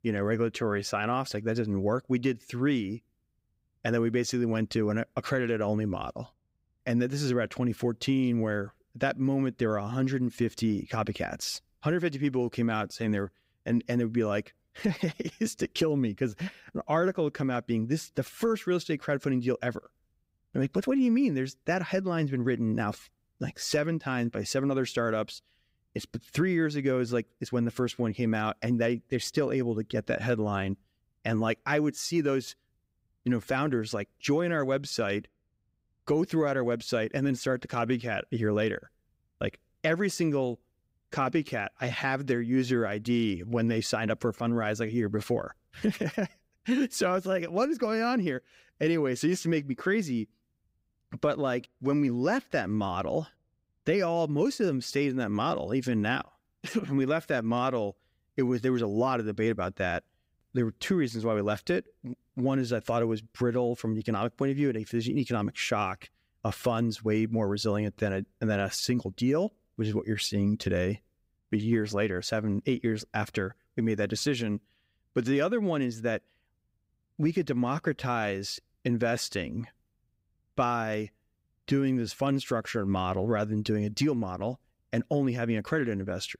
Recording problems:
none

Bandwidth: 15.5 kHz